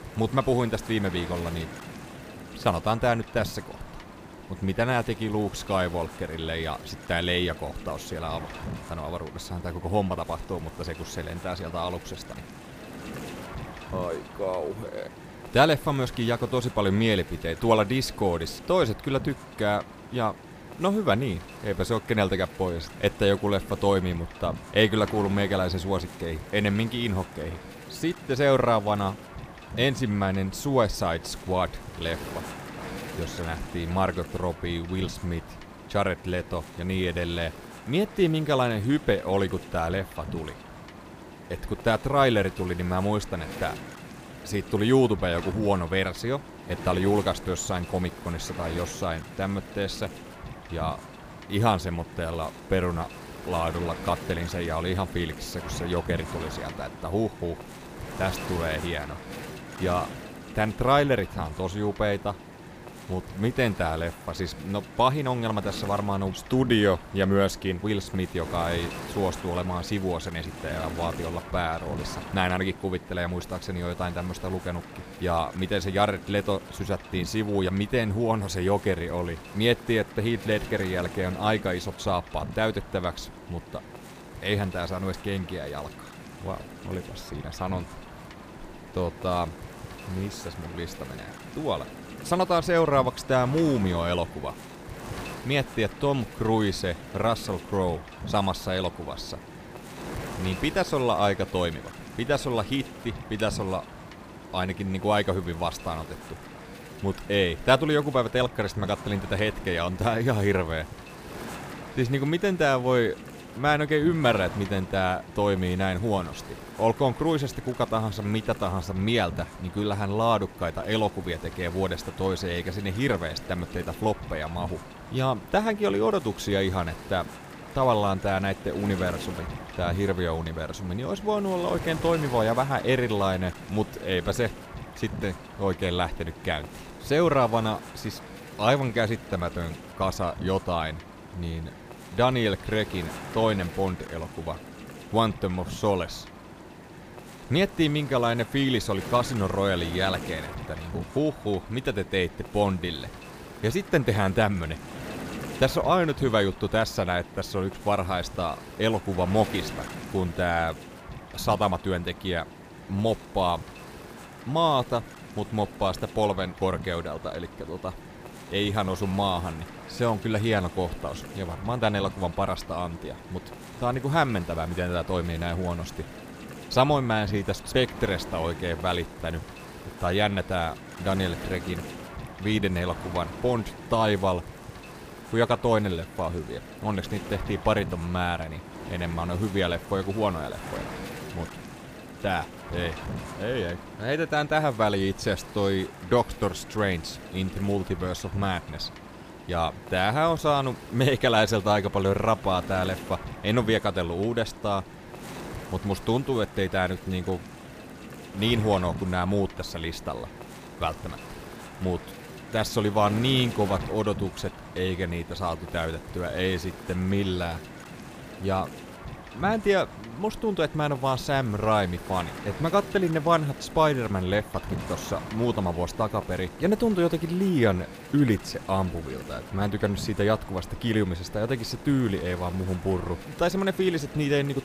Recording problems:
wind noise on the microphone; occasional gusts; 15 dB below the speech

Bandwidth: 15 kHz